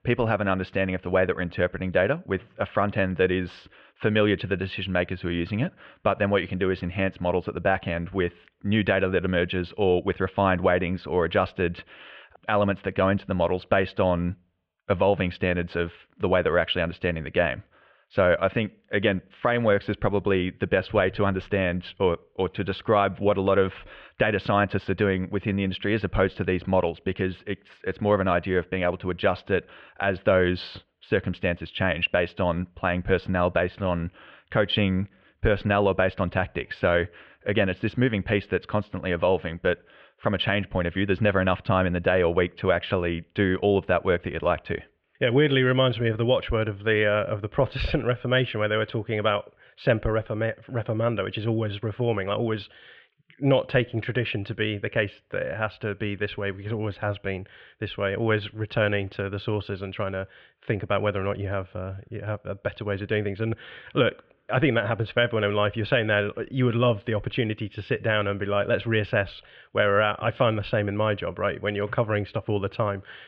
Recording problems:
muffled; very; fading above 3 kHz

